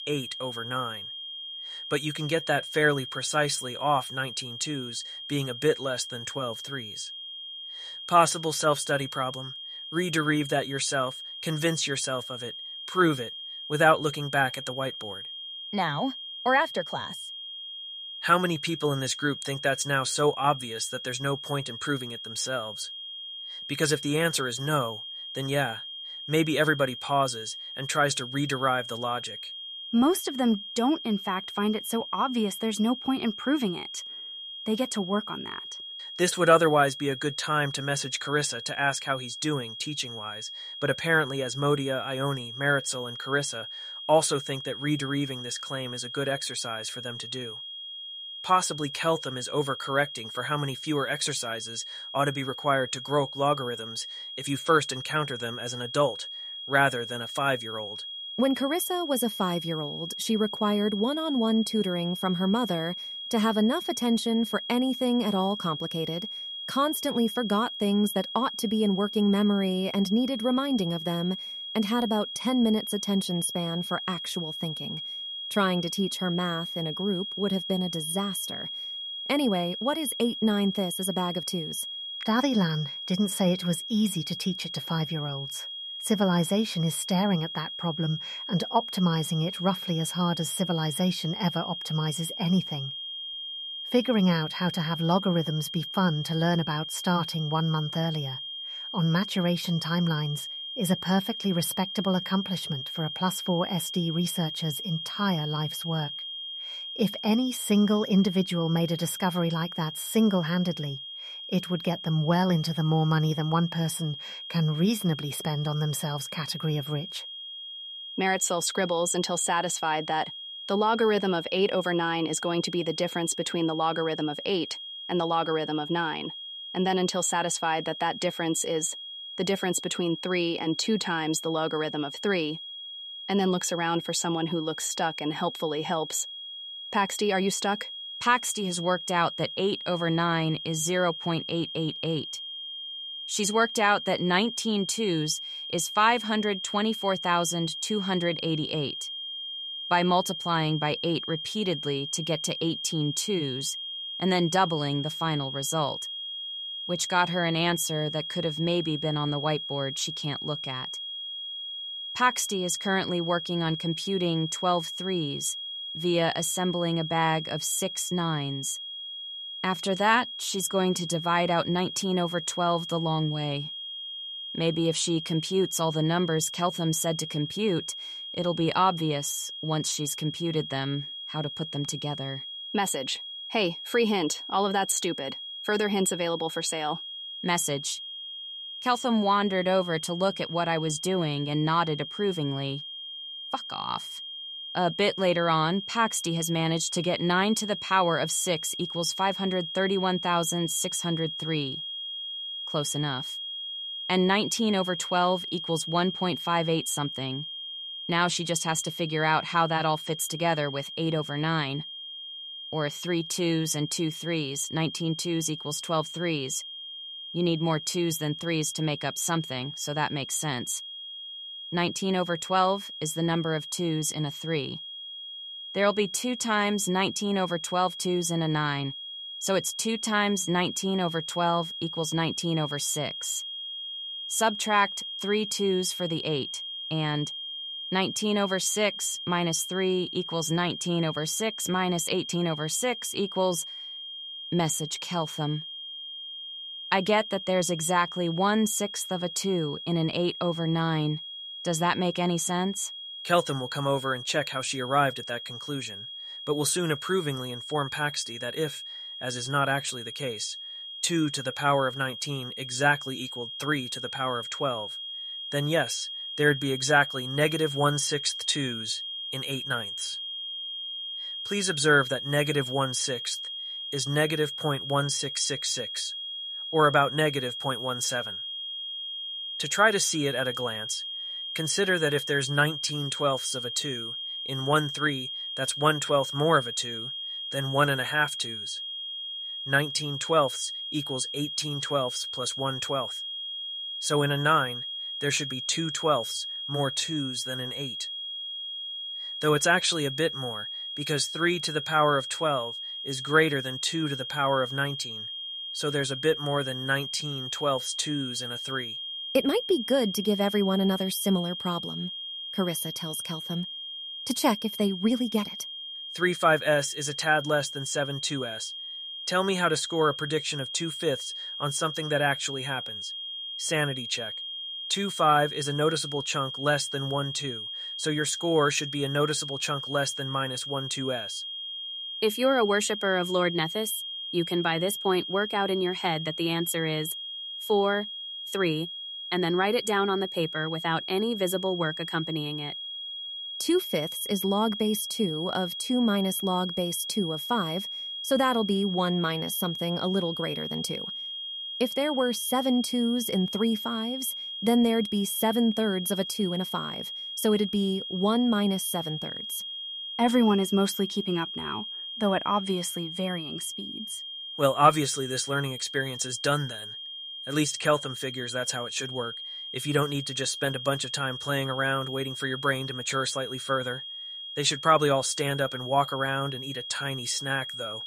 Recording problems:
high-pitched whine; loud; throughout; 3.5 kHz, 7 dB below the speech

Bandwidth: 14 kHz